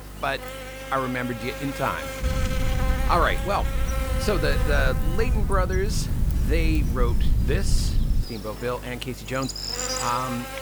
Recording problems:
electrical hum; loud; throughout; 50 Hz, 6 dB below the speech
low rumble; noticeable; from 2 to 8 s; 15 dB below the speech

